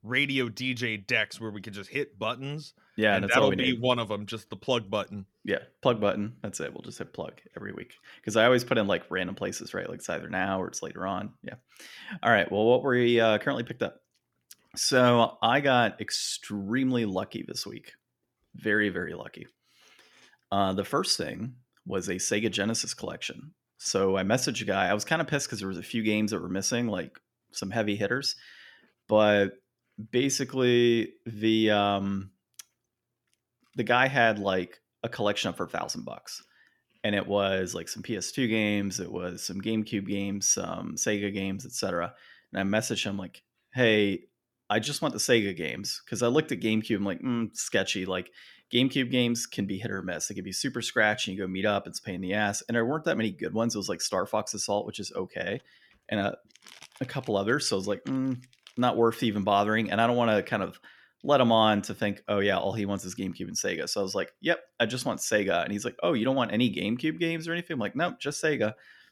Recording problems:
none

